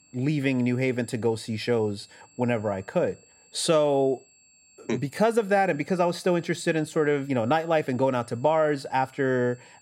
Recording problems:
high-pitched whine; faint; throughout; 7.5 kHz, 30 dB below the speech

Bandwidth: 16 kHz